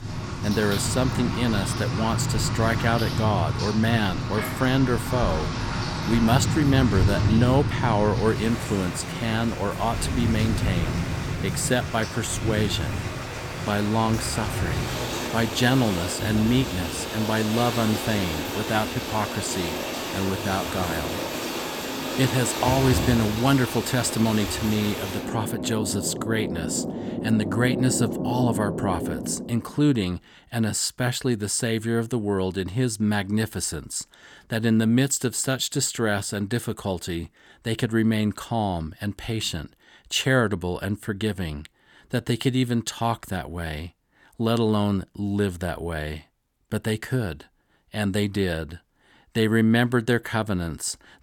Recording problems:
rain or running water; loud; until 29 s; 3 dB below the speech

